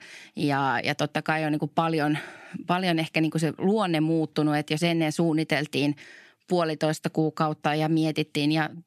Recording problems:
none

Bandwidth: 14 kHz